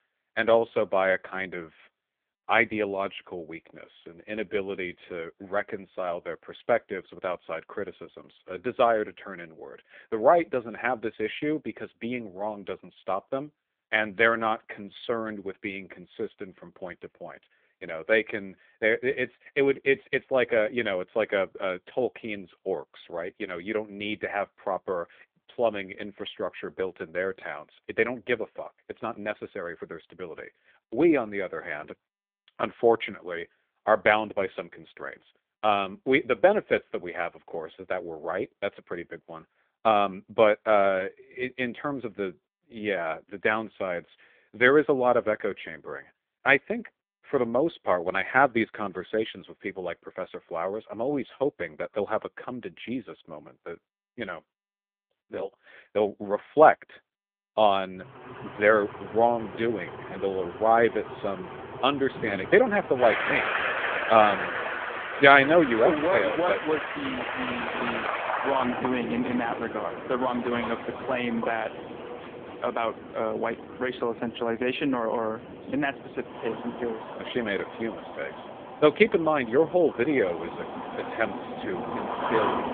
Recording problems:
phone-call audio; poor line; nothing above 3.5 kHz
traffic noise; loud; from 58 s on; 7 dB below the speech

